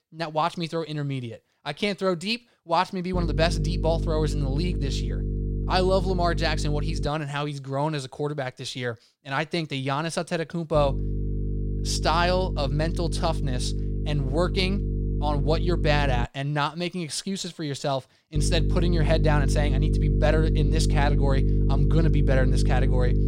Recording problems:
electrical hum; loud; from 3 to 7 s, from 11 to 16 s and from 18 s on; 50 Hz, 9 dB below the speech

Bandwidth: 16 kHz